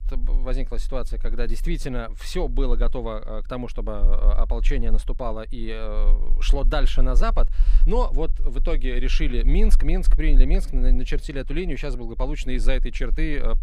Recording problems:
low rumble; faint; throughout; 20 dB below the speech

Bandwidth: 15.5 kHz